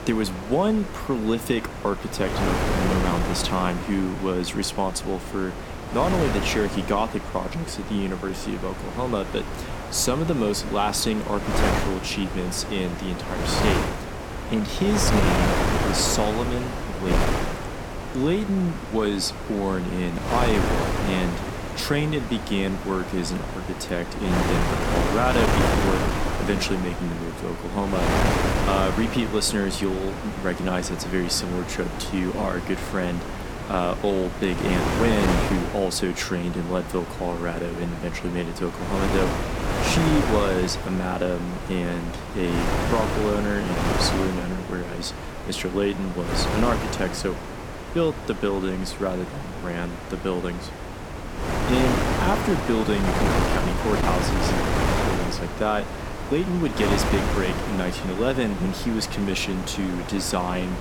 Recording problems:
wind noise on the microphone; heavy; 1 dB below the speech

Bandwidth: 17.5 kHz